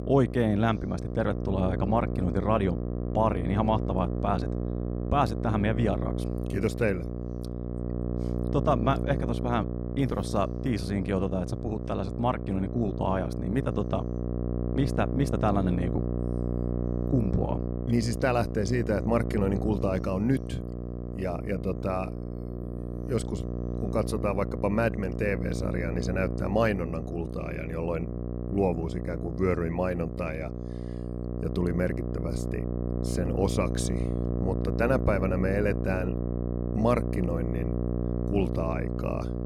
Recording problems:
electrical hum; loud; throughout; 60 Hz, 8 dB below the speech

